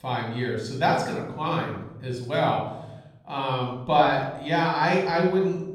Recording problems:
room echo; noticeable; dies away in 0.9 s
off-mic speech; somewhat distant

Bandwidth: 17 kHz